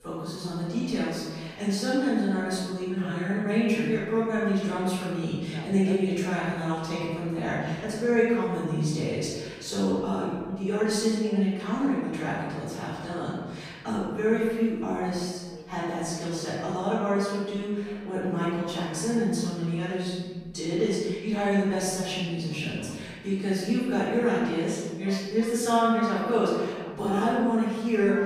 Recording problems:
room echo; strong; dies away in 1.3 s
off-mic speech; far
voice in the background; faint; throughout; 20 dB below the speech

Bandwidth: 15 kHz